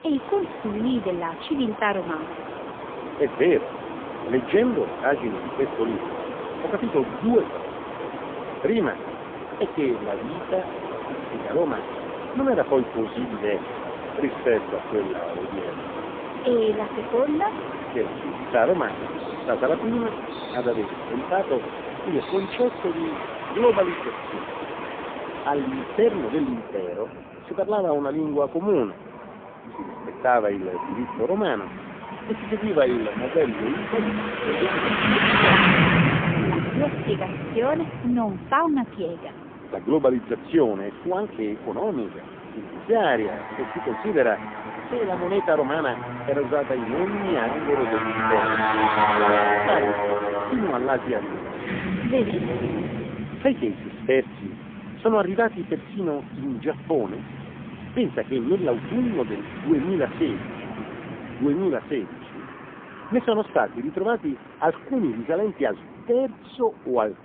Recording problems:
phone-call audio; poor line; nothing above 3 kHz
traffic noise; loud; throughout; 3 dB below the speech

